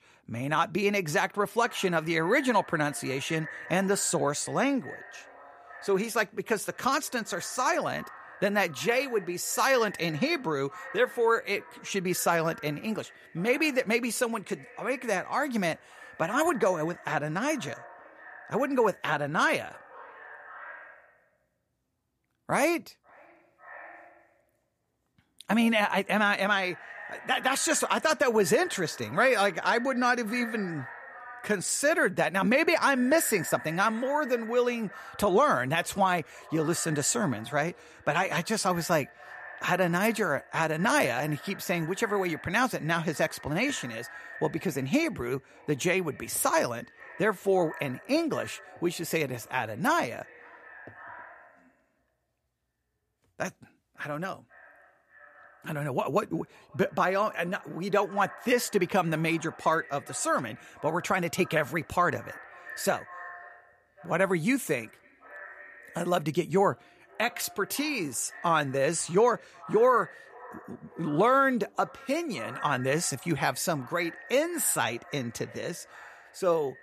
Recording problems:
echo of what is said; noticeable; throughout; 540 ms later, 20 dB below the speech

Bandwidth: 15 kHz